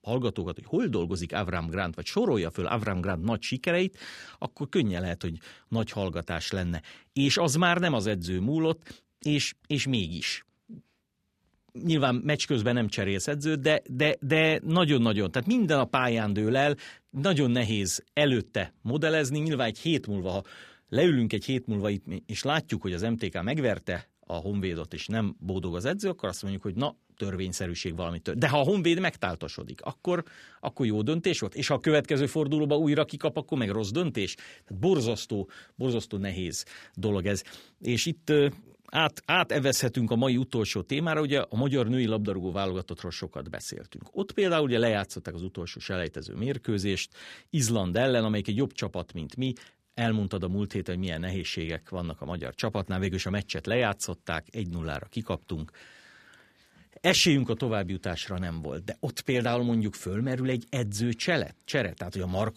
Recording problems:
none

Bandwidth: 14.5 kHz